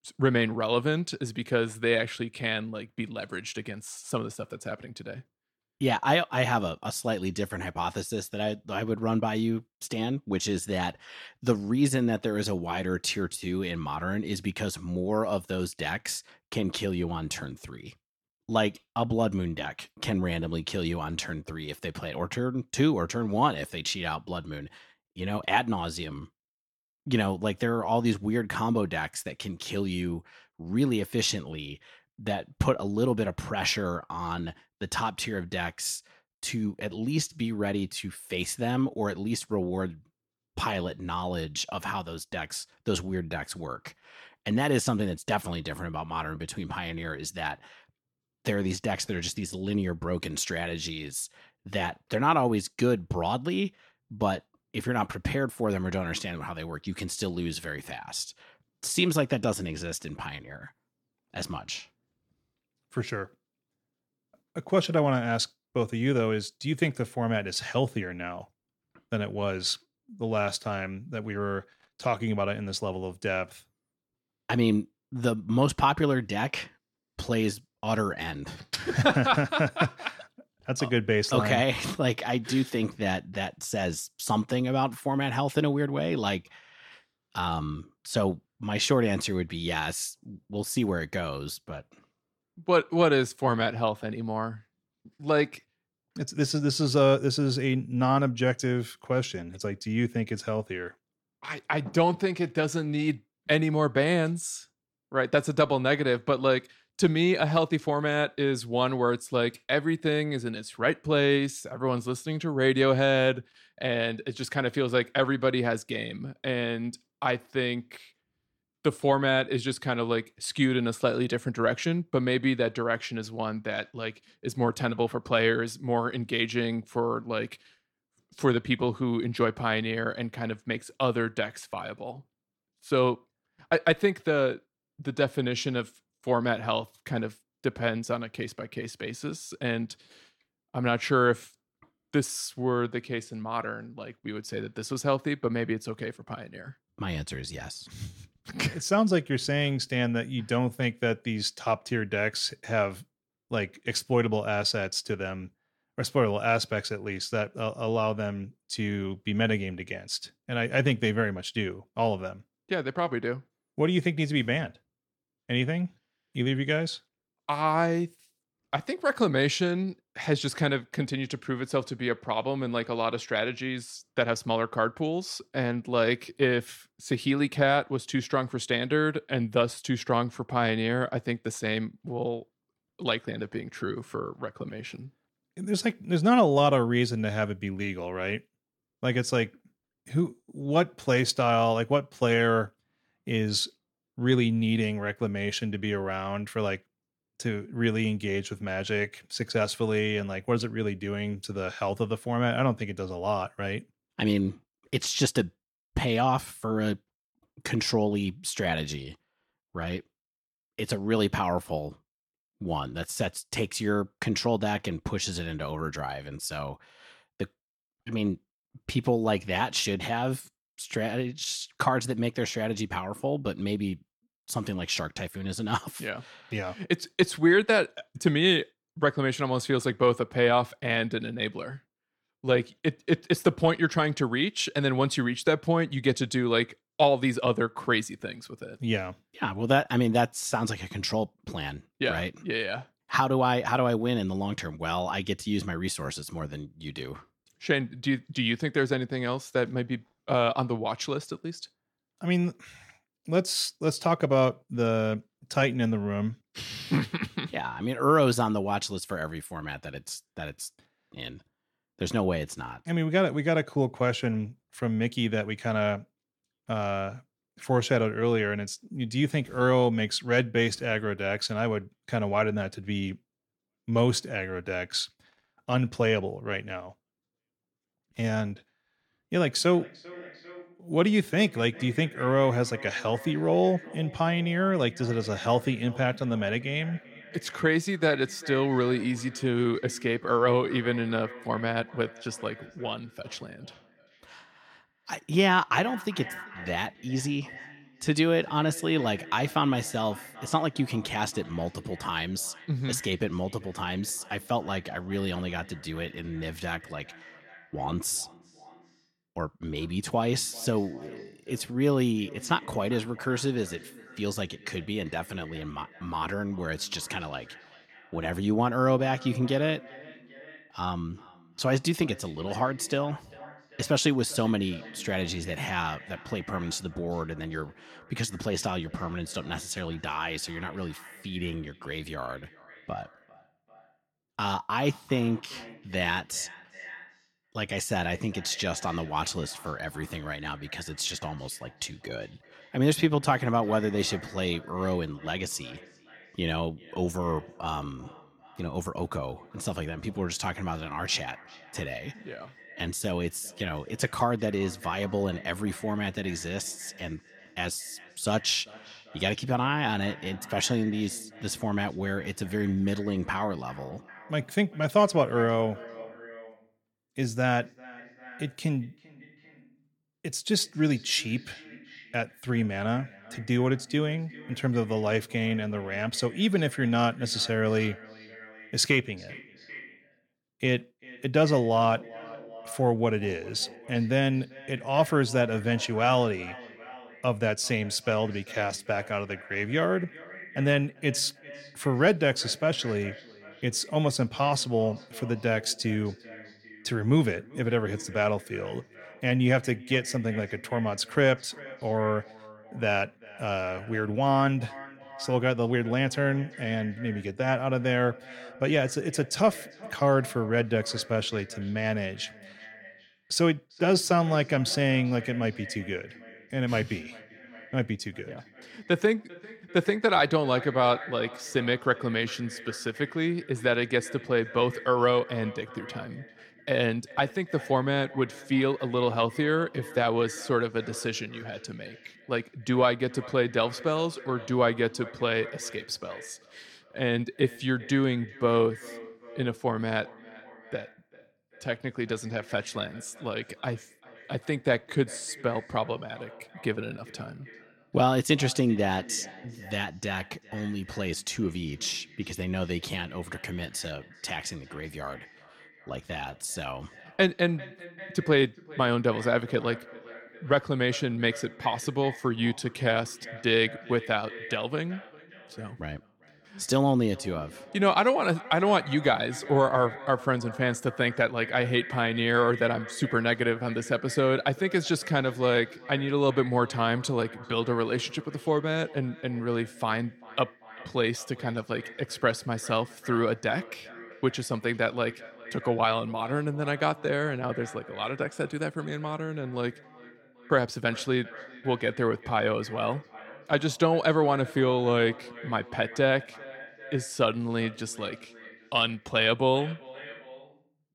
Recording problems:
echo of what is said; faint; from 4:39 on; 390 ms later, 20 dB below the speech

